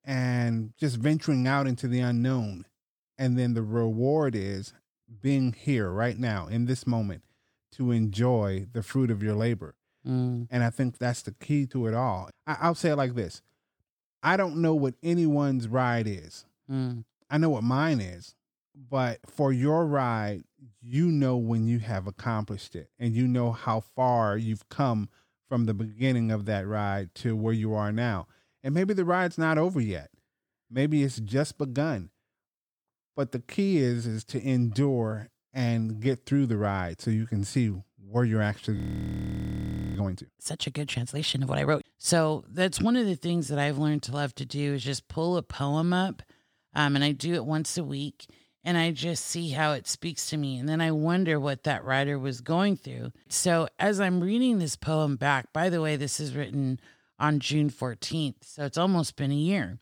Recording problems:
audio freezing; at 39 s for 1 s

